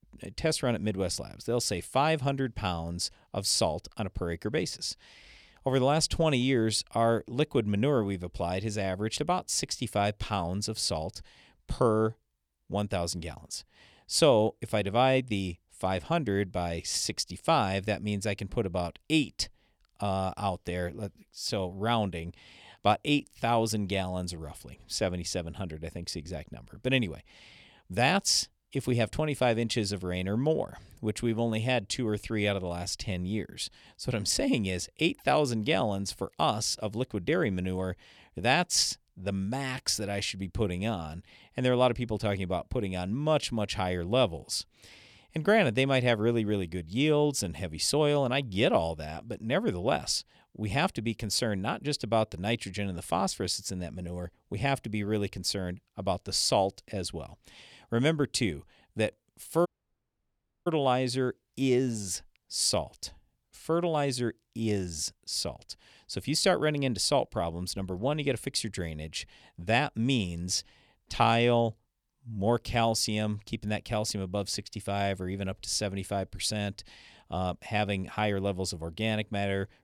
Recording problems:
audio cutting out; at 1:00 for 1 s

